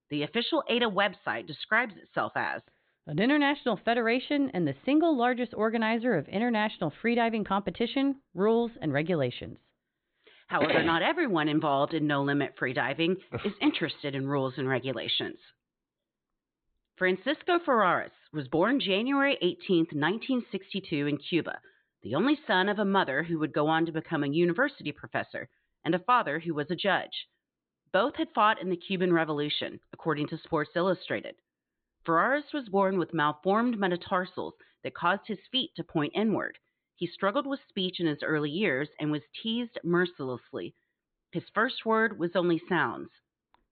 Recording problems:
high frequencies cut off; severe; nothing above 4 kHz

